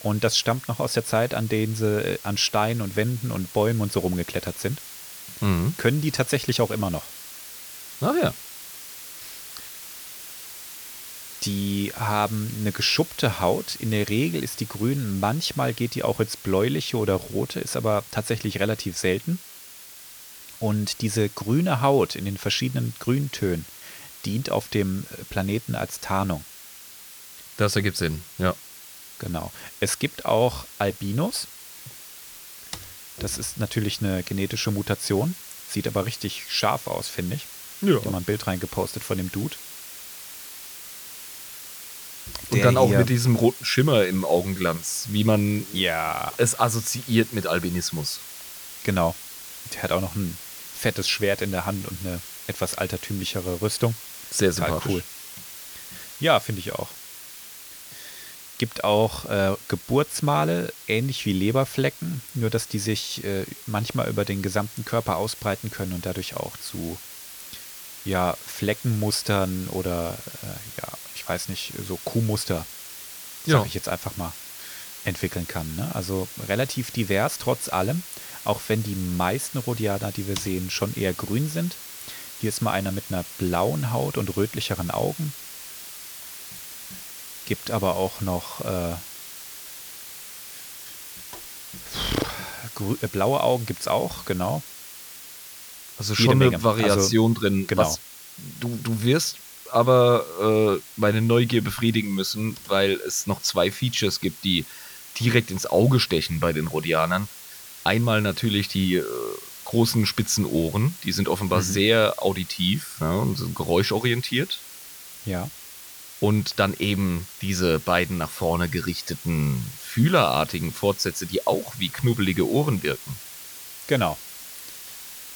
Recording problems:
hiss; noticeable; throughout; 15 dB below the speech

